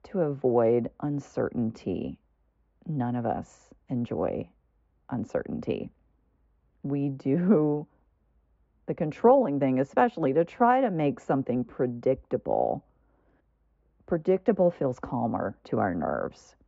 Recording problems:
high frequencies cut off; noticeable; nothing above 8 kHz
muffled; very slightly; fading above 3 kHz

